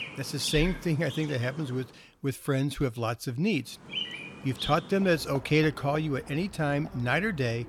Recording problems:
animal sounds; noticeable; throughout; 10 dB below the speech

